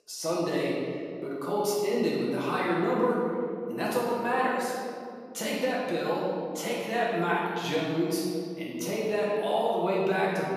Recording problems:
room echo; strong; dies away in 2.3 s
off-mic speech; far

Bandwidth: 14.5 kHz